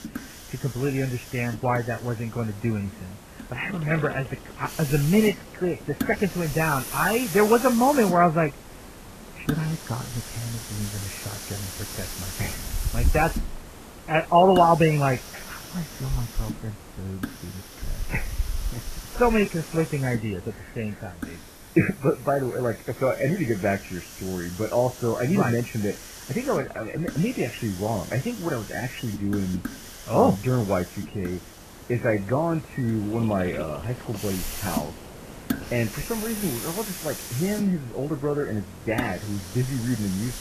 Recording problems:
garbled, watery; badly; nothing above 3 kHz
hiss; noticeable; throughout; 10 dB below the speech

